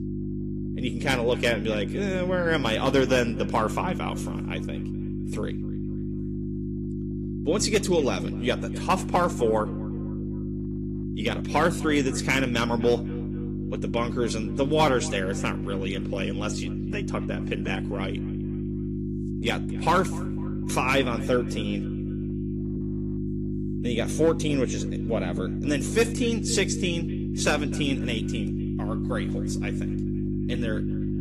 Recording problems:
echo of what is said; faint; throughout; 250 ms later, 20 dB below the speech
garbled, watery; slightly; nothing above 14.5 kHz
electrical hum; noticeable; throughout; 50 Hz, 10 dB below the speech

